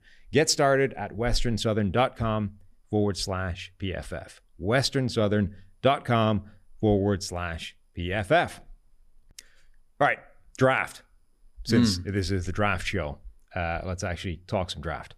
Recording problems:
none

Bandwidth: 14.5 kHz